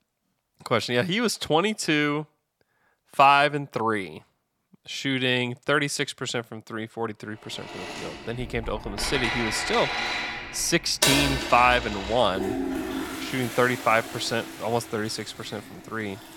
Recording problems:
household noises; loud; from 7.5 s on; 5 dB below the speech

